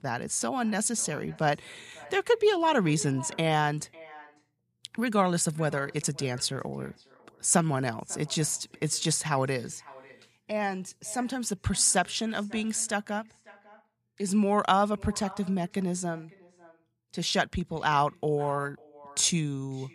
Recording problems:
echo of what is said; faint; throughout; 550 ms later, 25 dB below the speech

